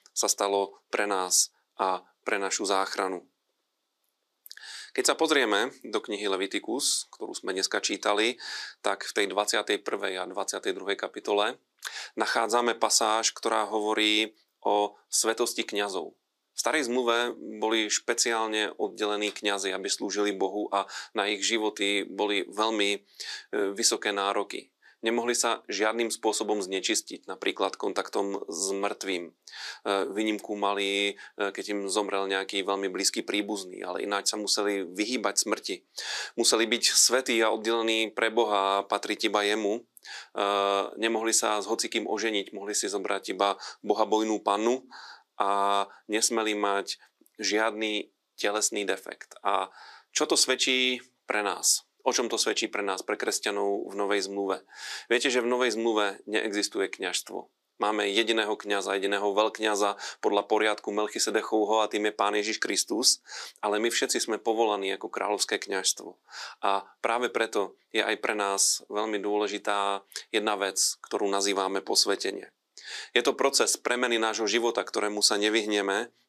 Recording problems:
thin; somewhat; fading below 300 Hz

